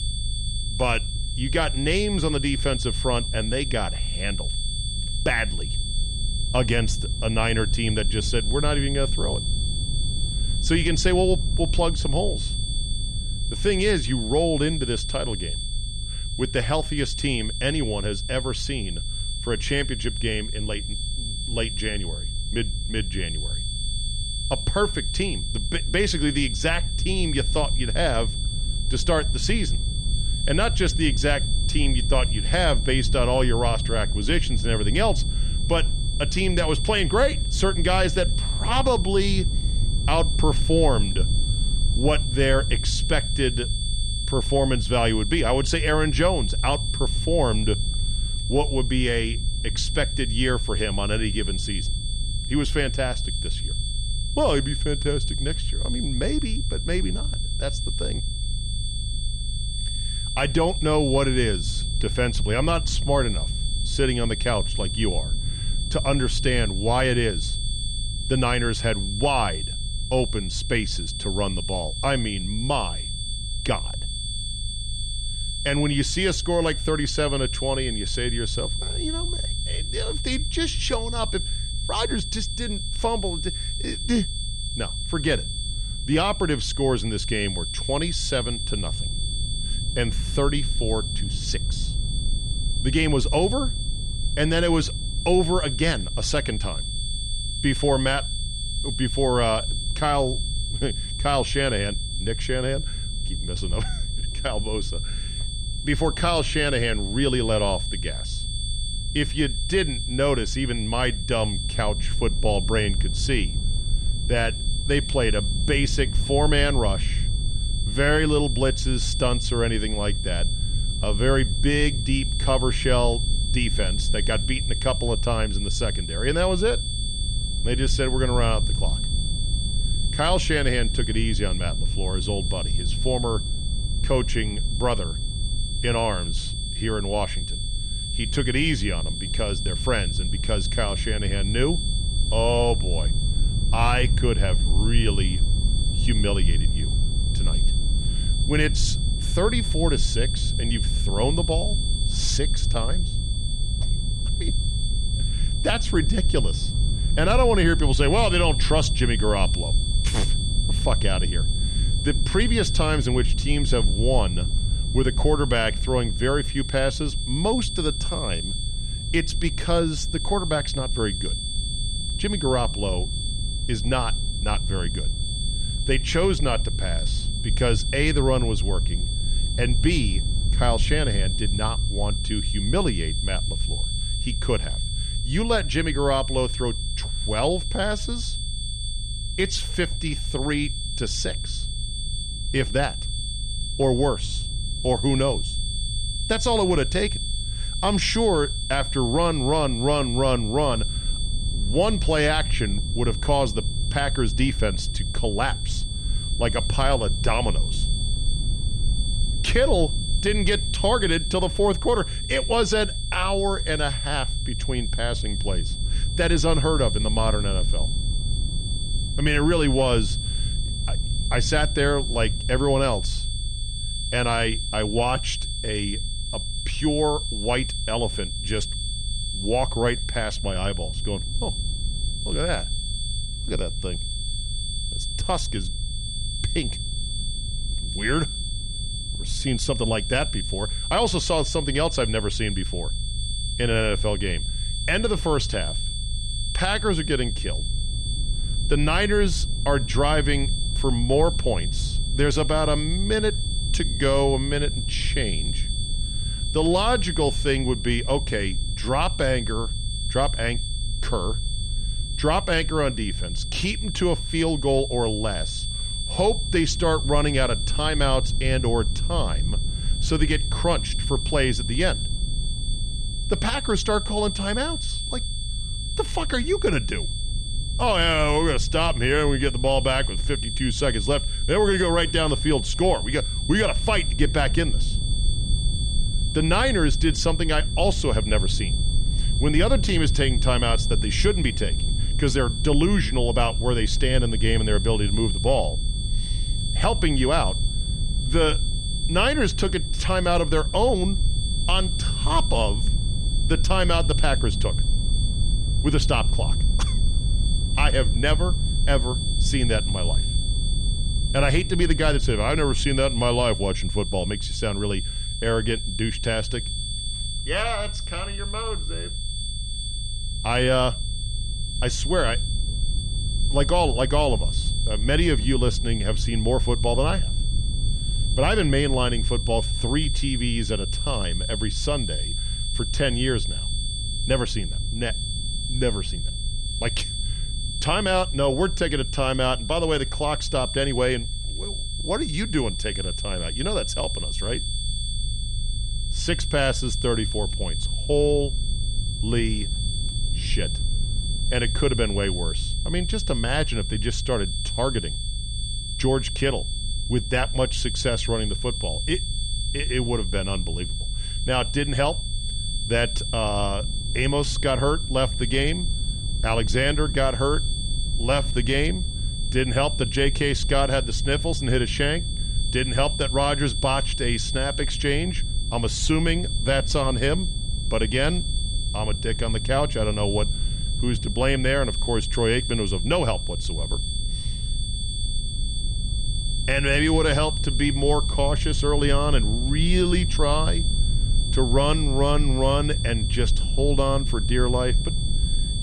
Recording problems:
high-pitched whine; loud; throughout; 3.5 kHz, 6 dB below the speech
low rumble; faint; throughout; 20 dB below the speech

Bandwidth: 15 kHz